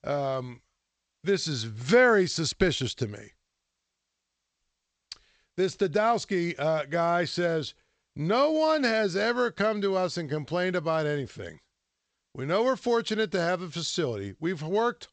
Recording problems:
garbled, watery; slightly; nothing above 8 kHz

